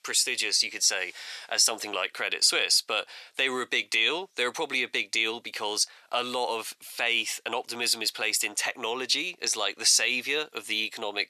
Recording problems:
thin; very; fading below 600 Hz

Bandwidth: 13.5 kHz